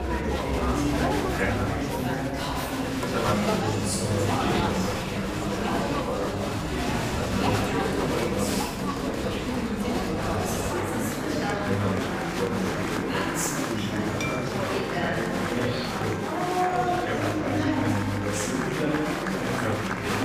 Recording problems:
room echo; strong; dies away in 1.6 s
off-mic speech; far
chatter from many people; very loud; throughout; 5 dB above the speech
background music; noticeable; throughout; 15 dB below the speech
clattering dishes; noticeable; at 14 s; peak 1 dB below the speech

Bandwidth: 15 kHz